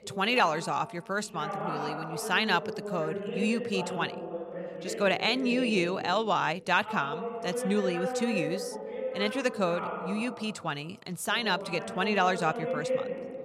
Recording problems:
voice in the background; loud; throughout; 6 dB below the speech

